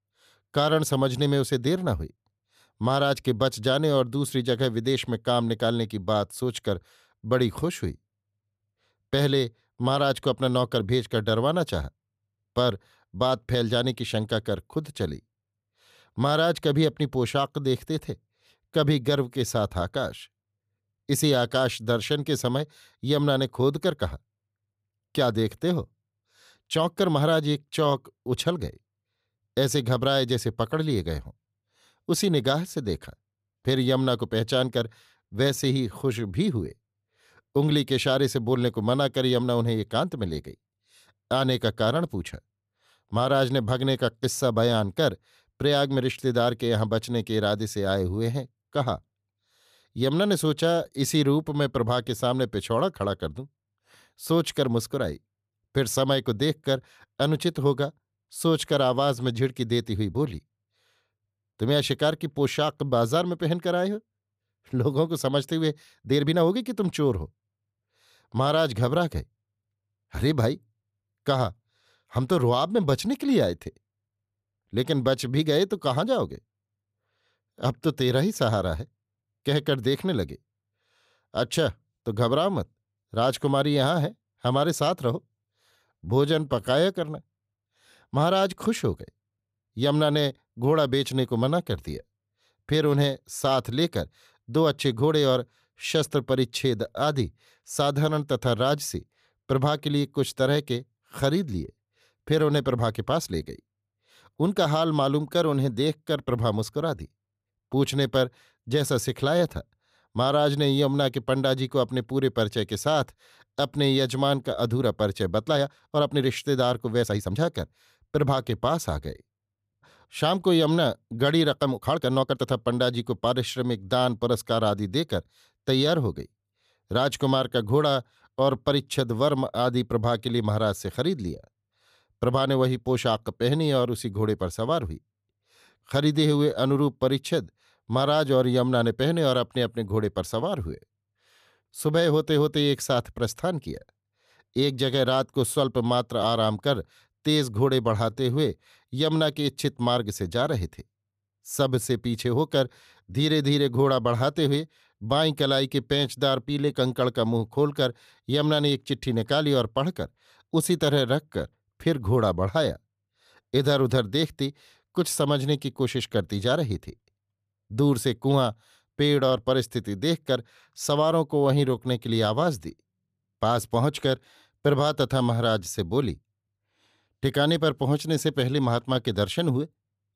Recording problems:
uneven, jittery; strongly; from 35 s to 2:52

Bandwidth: 14.5 kHz